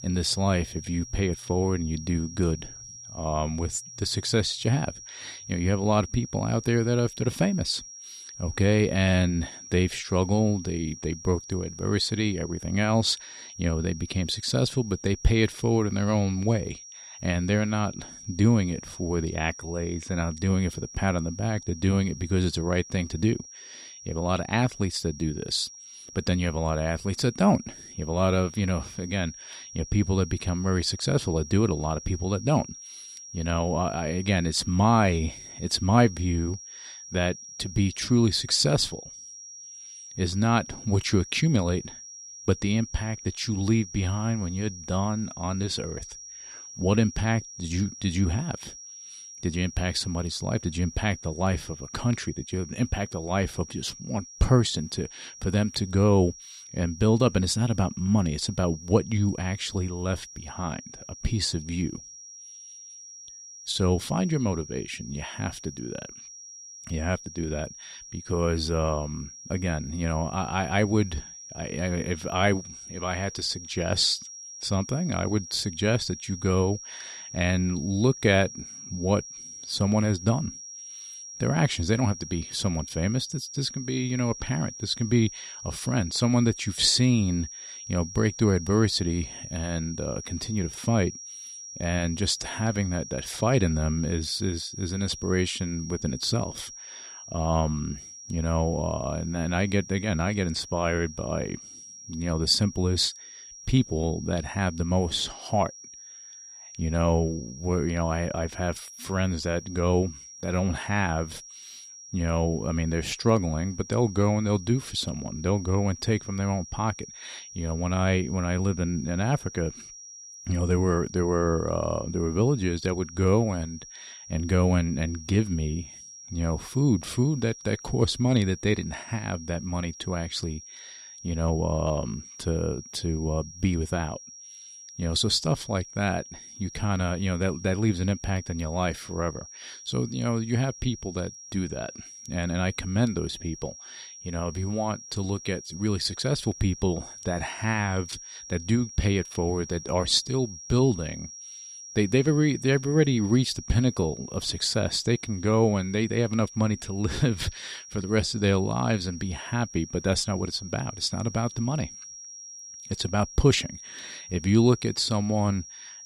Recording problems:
high-pitched whine; noticeable; throughout; 5.5 kHz, 15 dB below the speech

